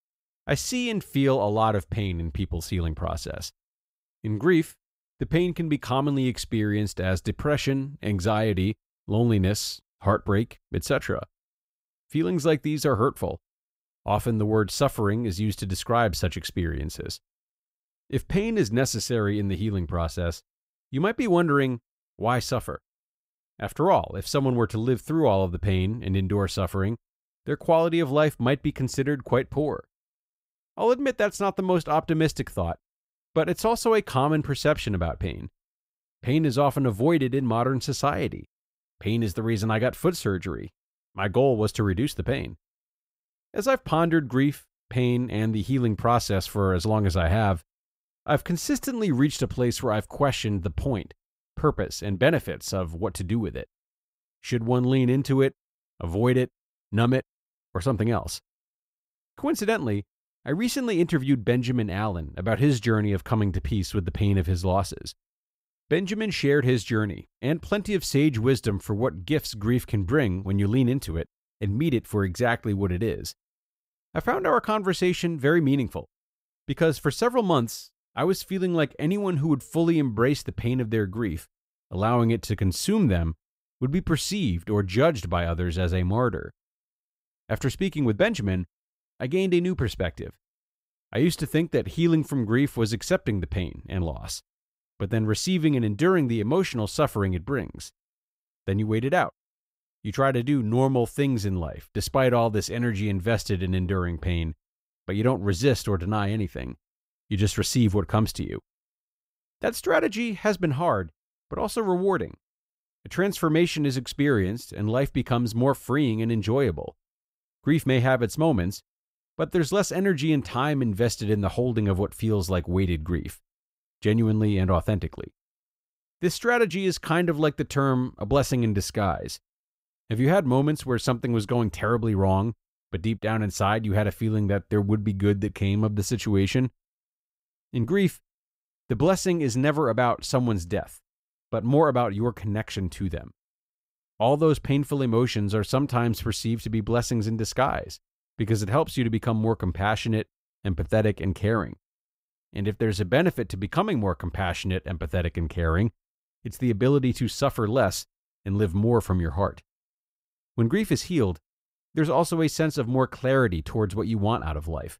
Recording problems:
none

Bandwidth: 15.5 kHz